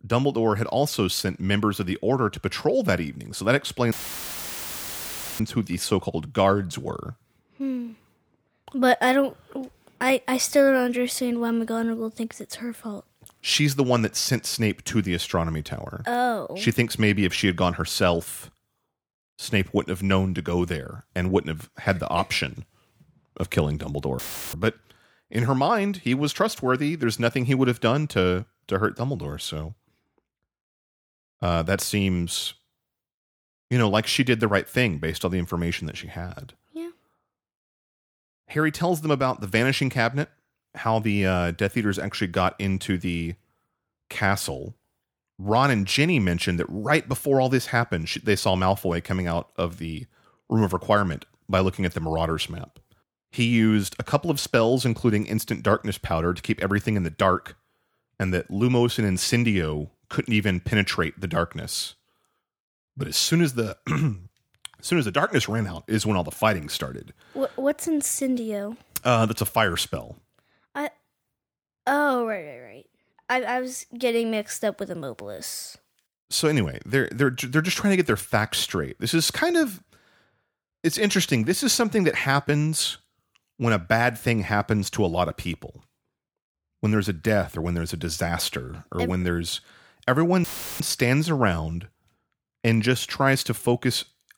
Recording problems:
audio cutting out; filled with static; at 4 s for 1.5 s, at 24 s and at 1:30

